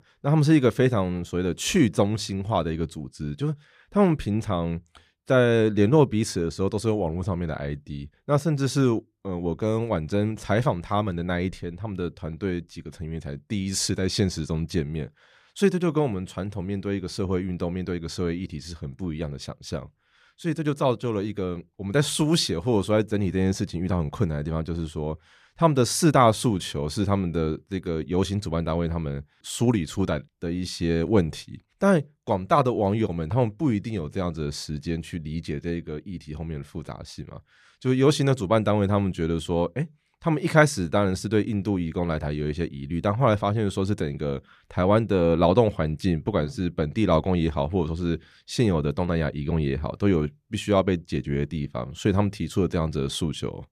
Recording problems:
none

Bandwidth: 14.5 kHz